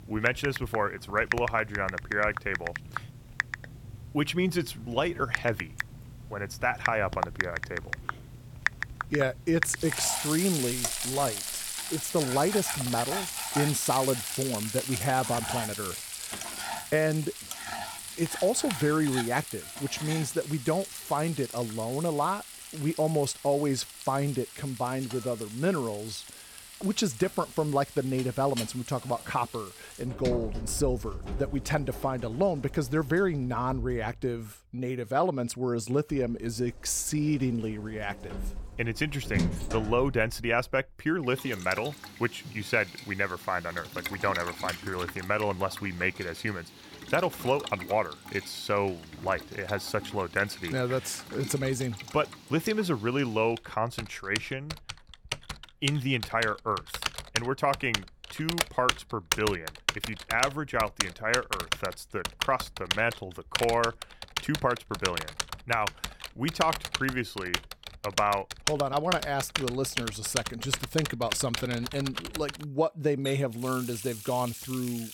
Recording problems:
household noises; loud; throughout; 5 dB below the speech

